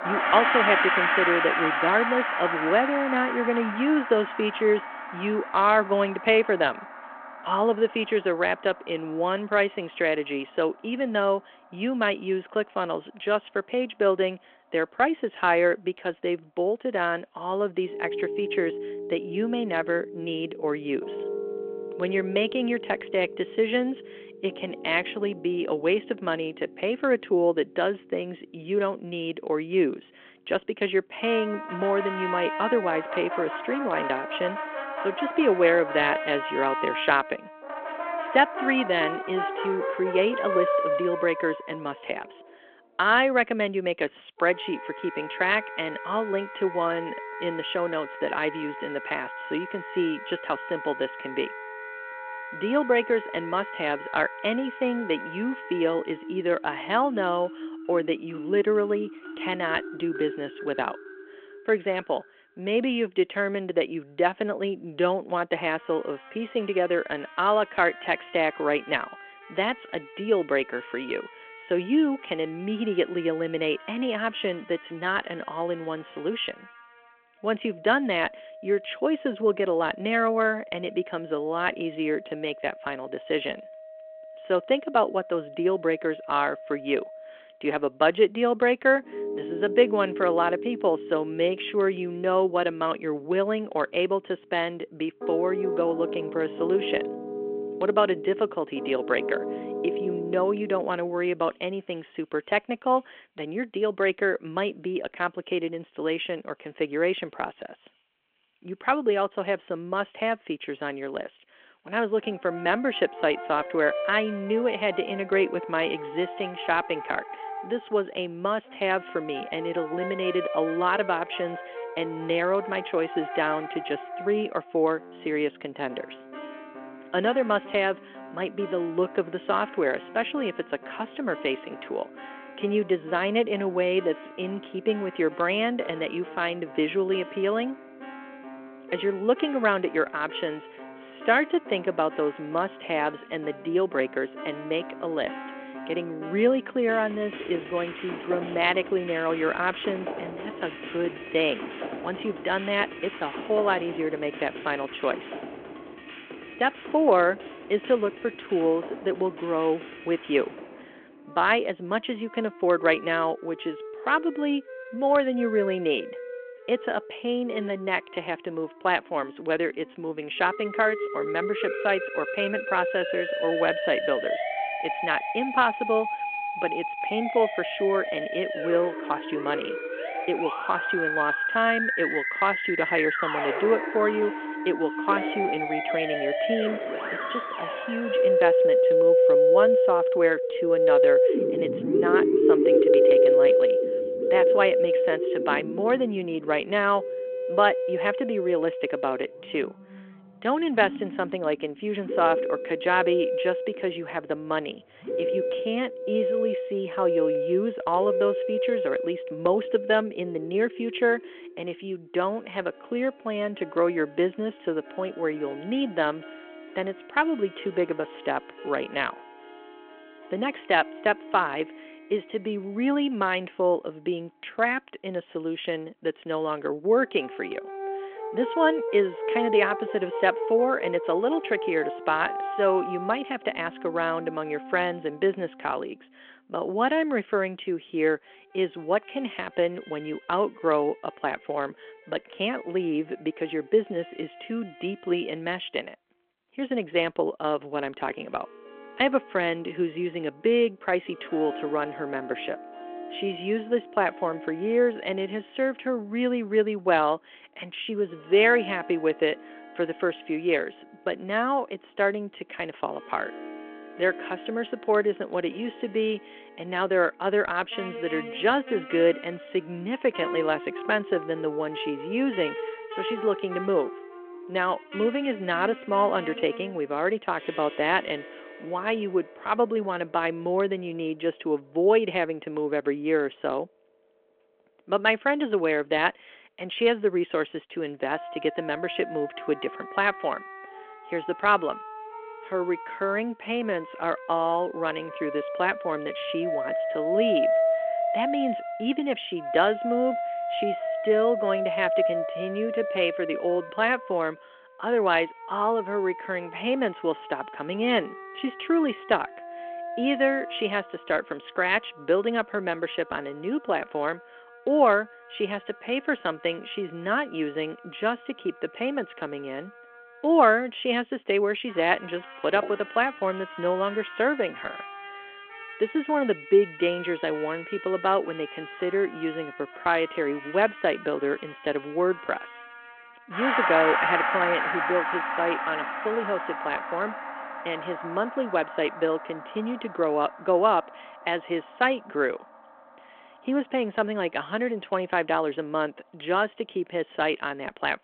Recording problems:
phone-call audio
background music; loud; throughout; 3 dB below the speech

